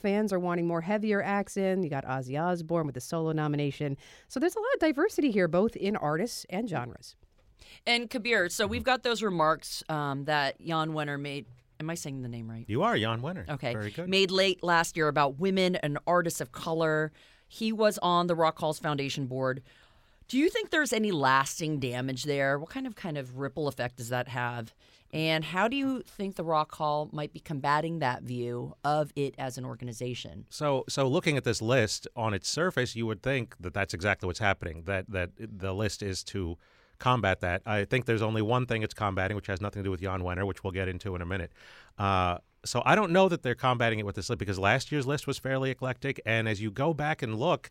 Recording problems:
none

